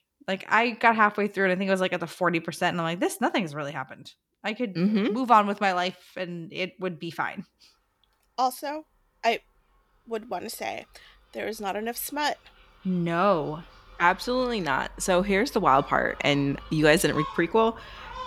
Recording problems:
animal sounds; noticeable; throughout; 20 dB below the speech

